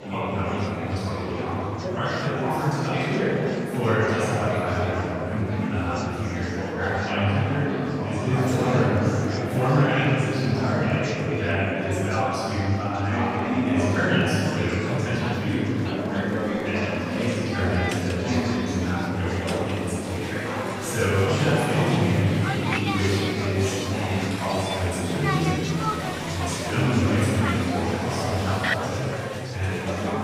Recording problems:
room echo; strong; dies away in 2.4 s
off-mic speech; far
murmuring crowd; loud; throughout; 3 dB below the speech

